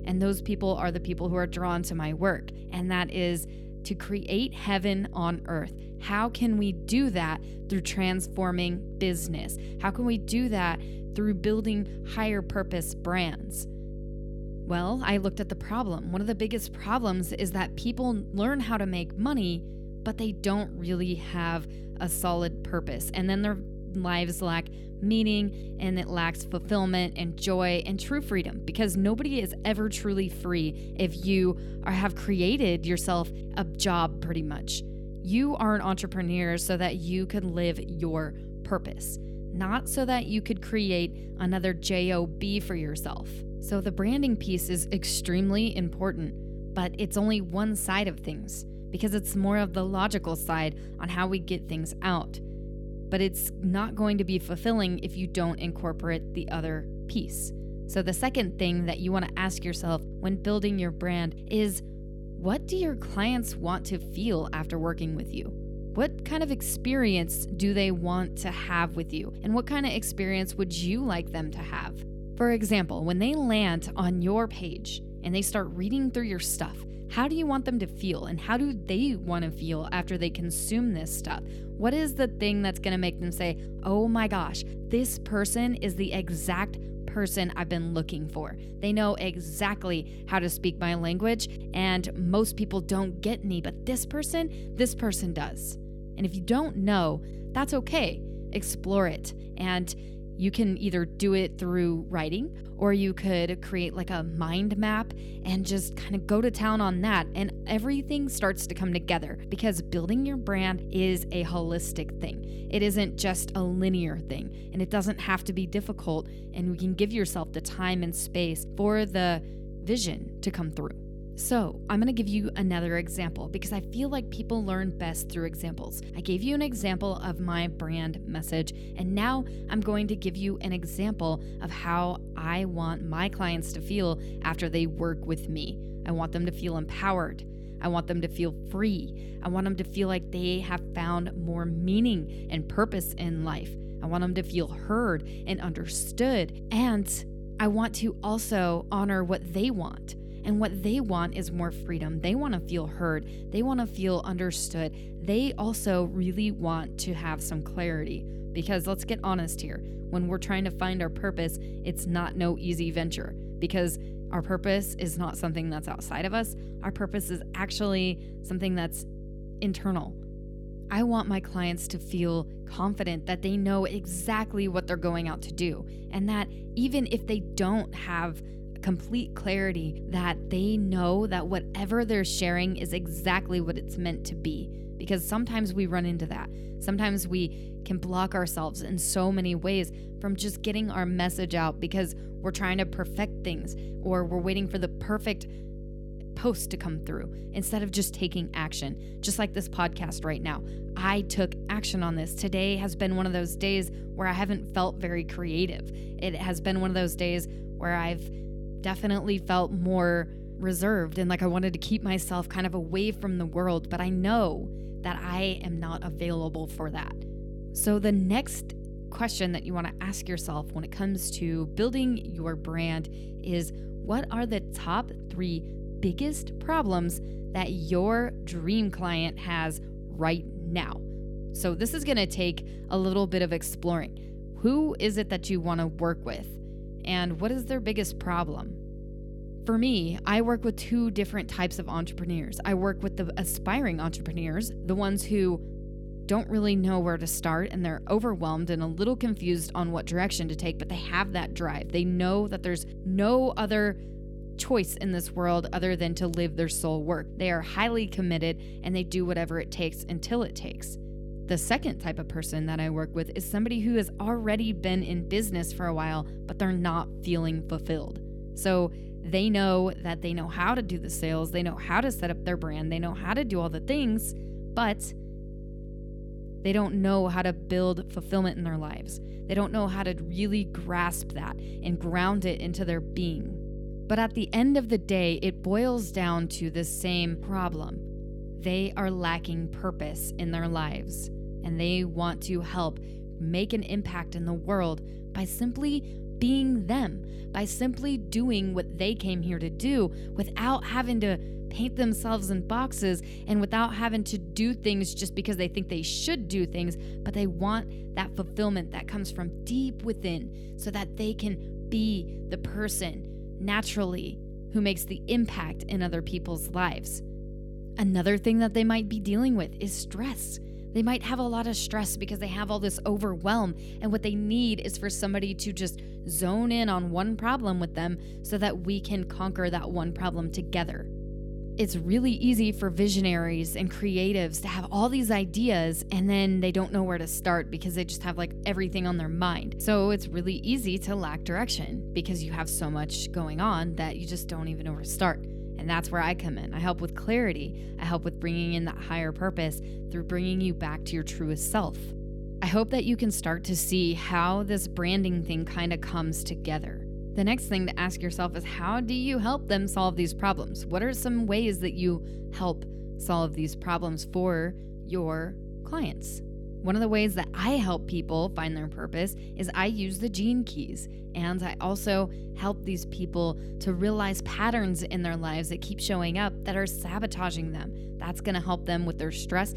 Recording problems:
electrical hum; noticeable; throughout; 50 Hz, 15 dB below the speech

